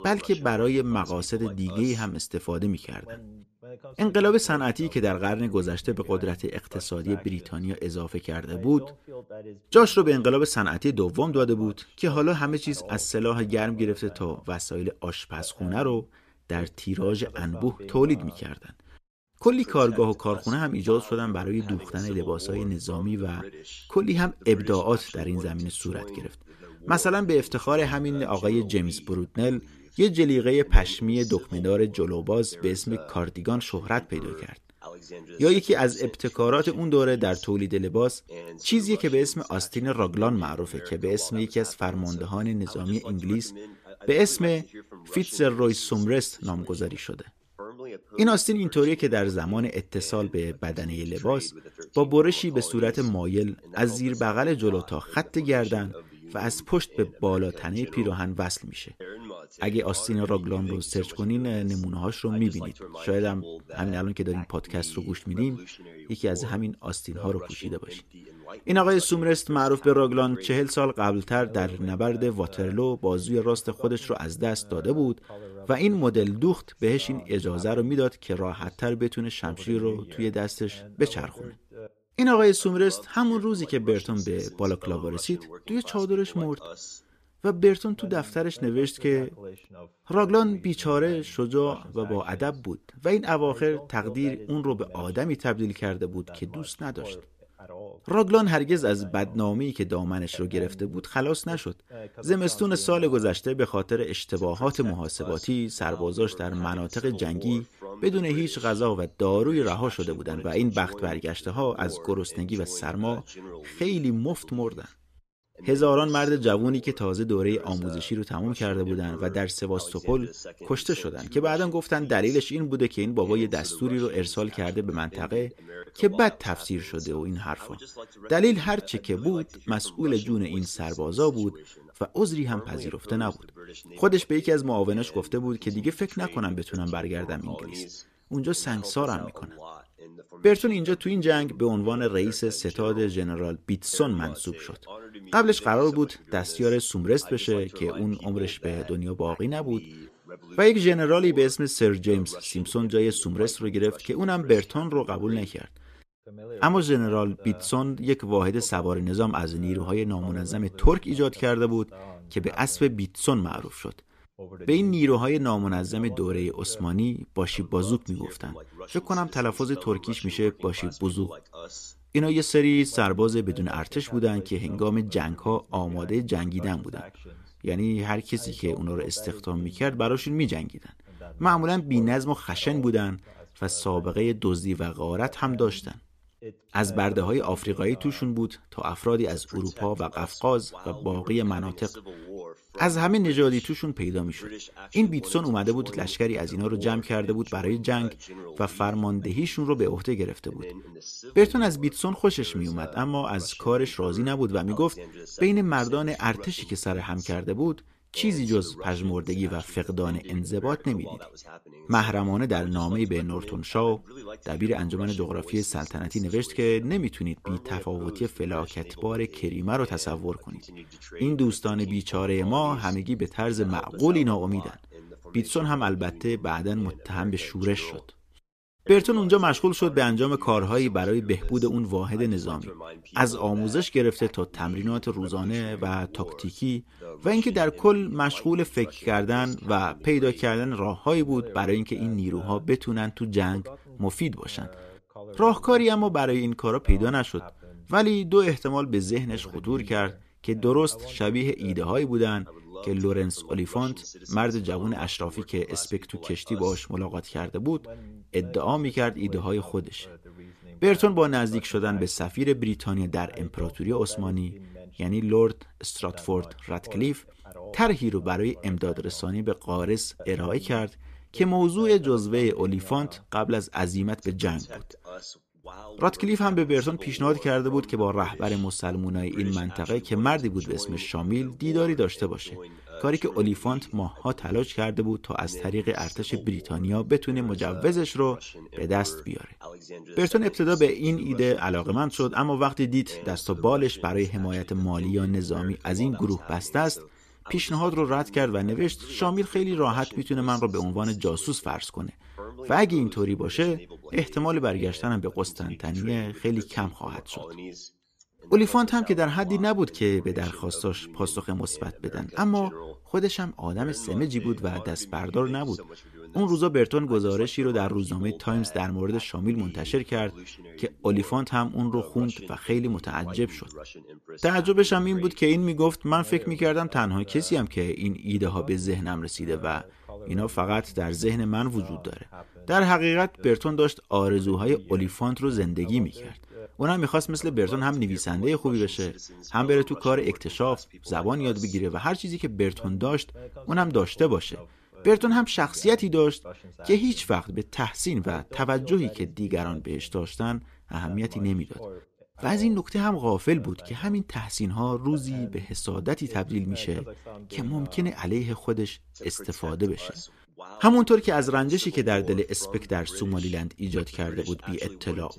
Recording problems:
voice in the background; noticeable; throughout; 20 dB below the speech

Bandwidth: 14.5 kHz